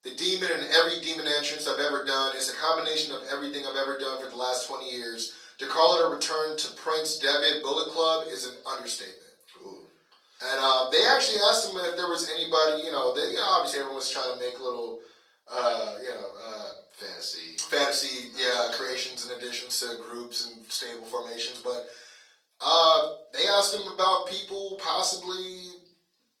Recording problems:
off-mic speech; far
thin; somewhat; fading below 600 Hz
room echo; slight; dies away in 0.4 s
garbled, watery; slightly; nothing above 18.5 kHz

